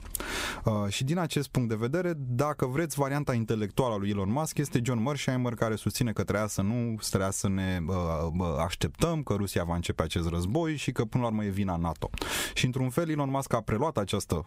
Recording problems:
squashed, flat; somewhat

